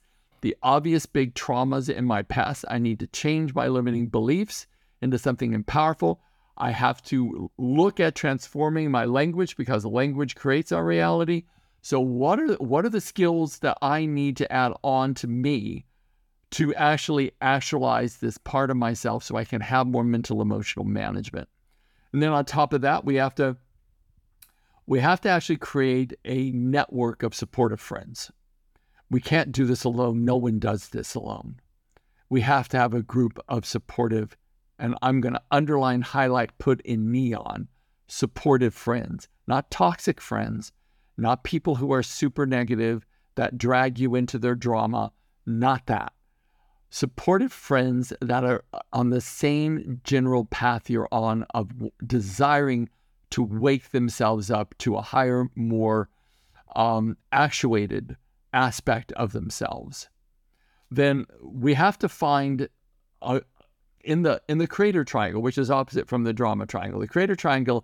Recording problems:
none

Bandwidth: 18 kHz